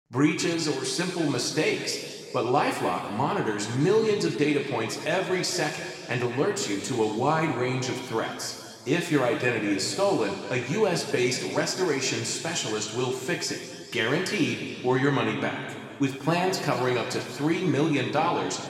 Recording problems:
room echo; noticeable; dies away in 2.2 s
off-mic speech; somewhat distant

